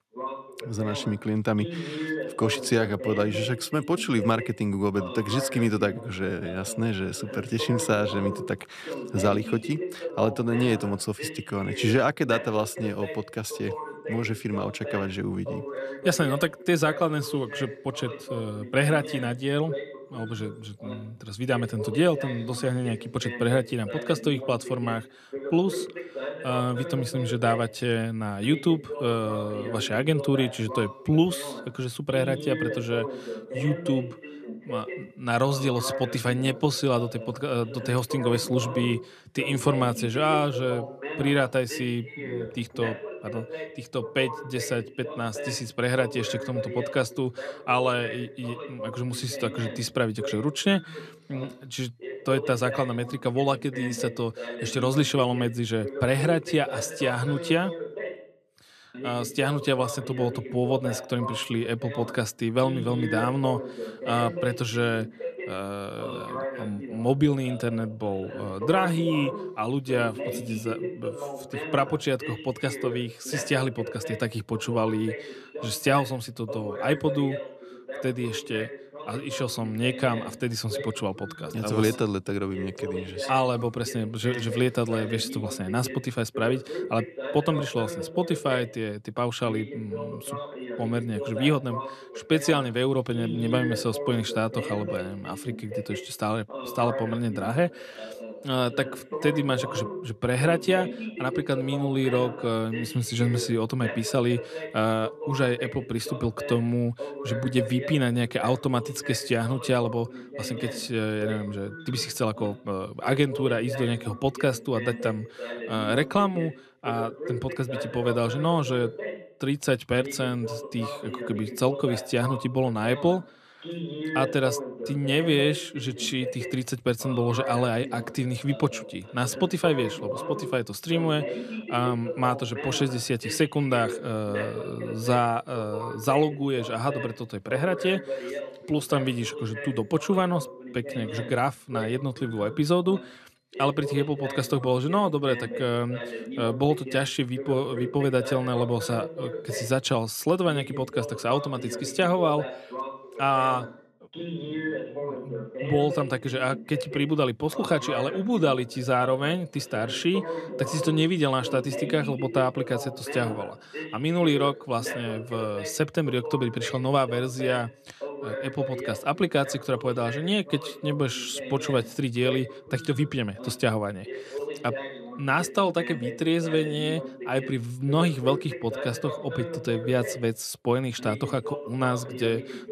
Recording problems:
voice in the background; loud; throughout; 9 dB below the speech

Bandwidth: 14.5 kHz